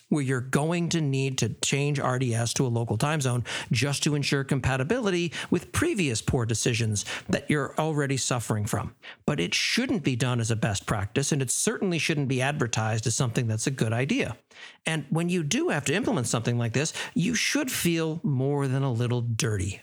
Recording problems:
squashed, flat; somewhat

